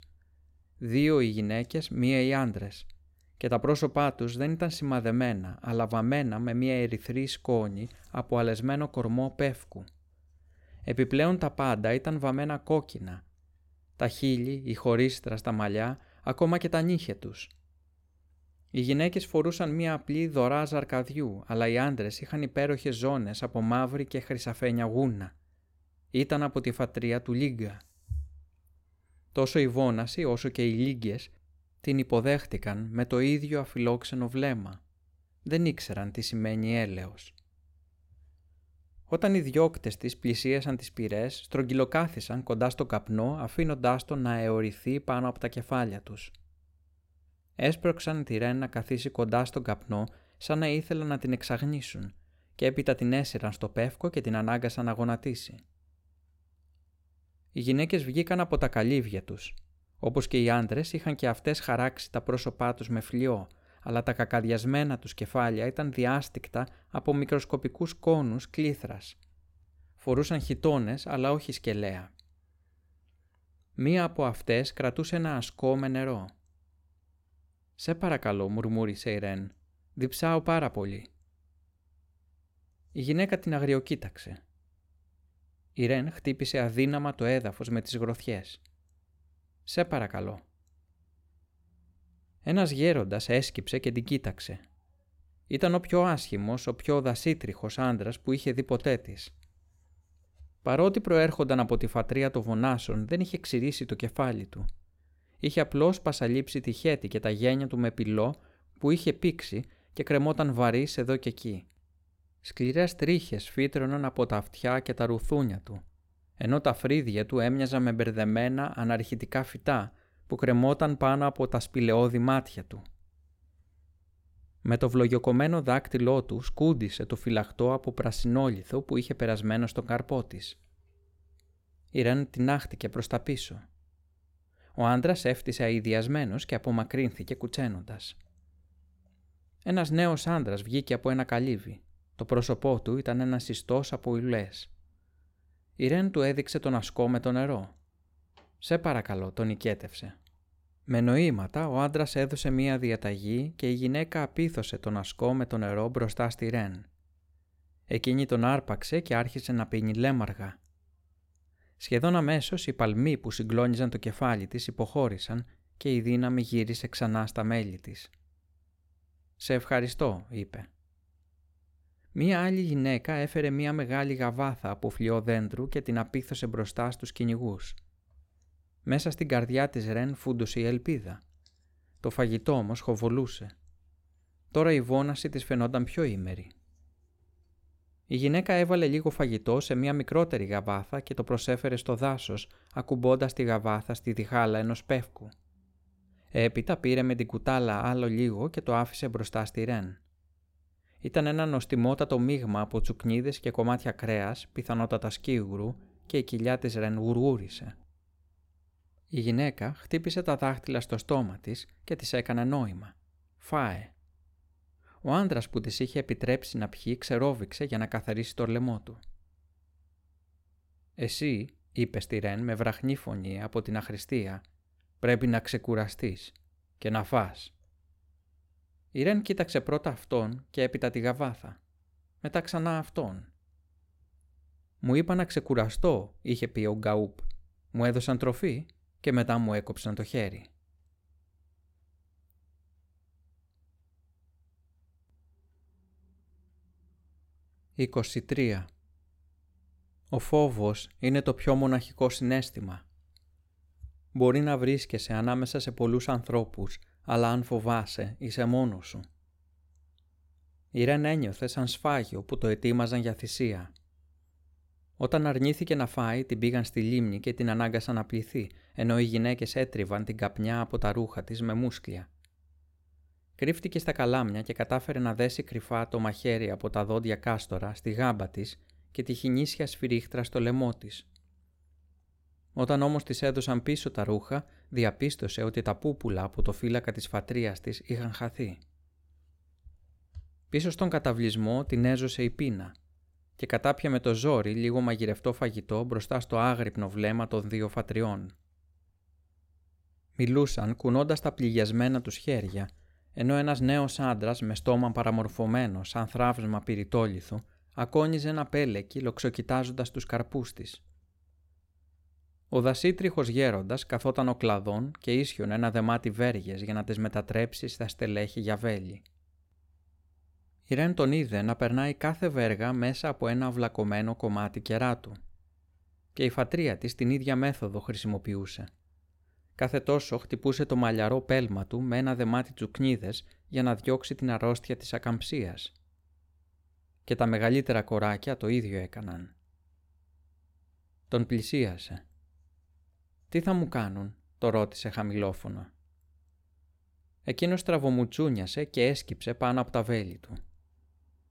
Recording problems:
none

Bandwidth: 16.5 kHz